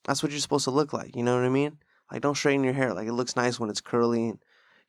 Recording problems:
none

